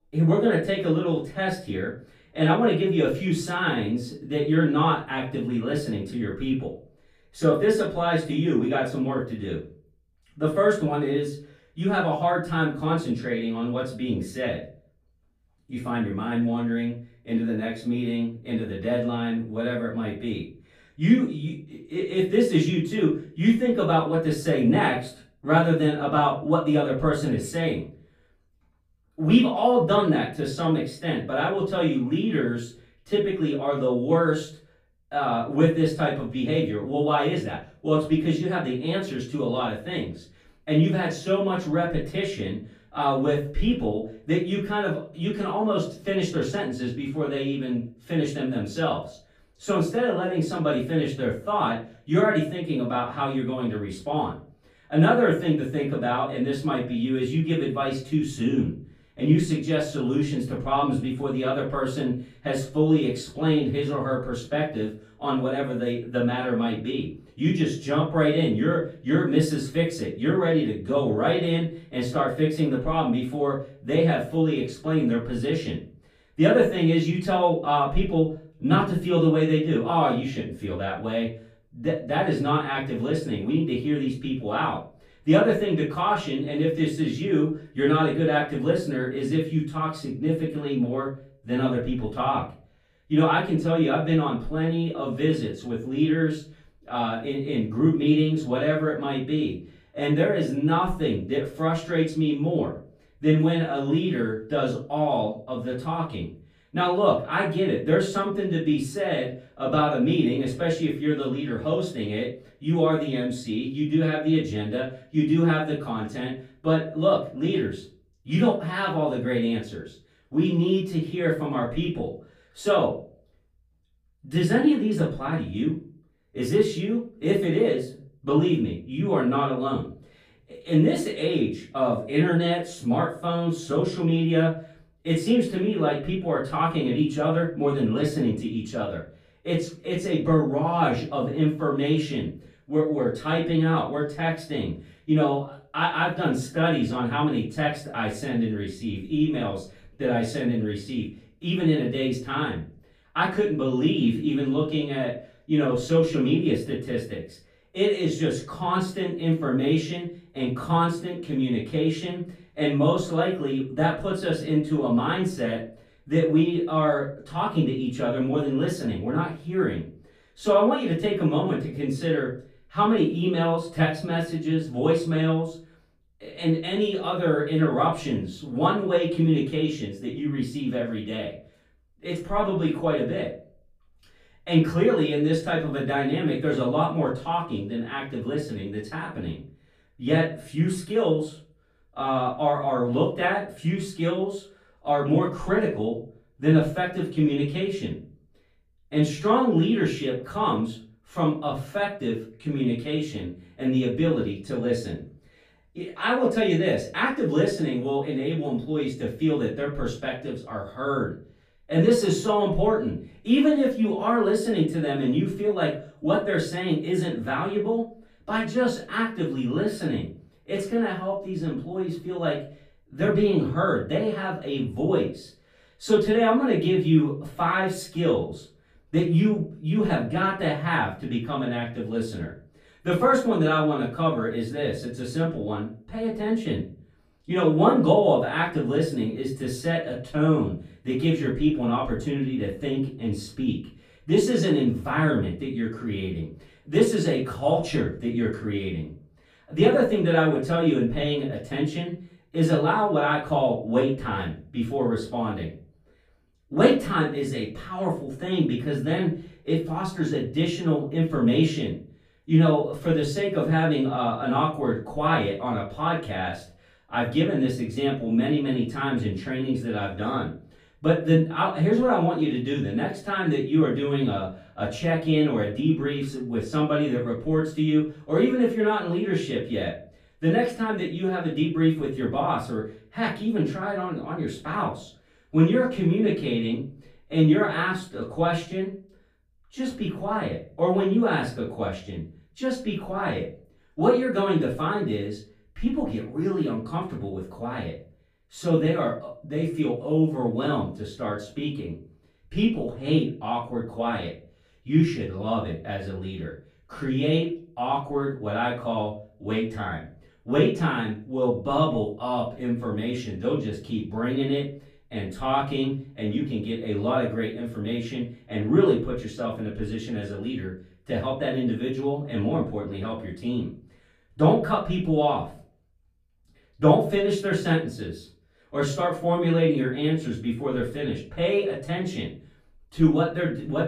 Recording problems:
off-mic speech; far
room echo; slight; dies away in 0.3 s

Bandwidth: 14.5 kHz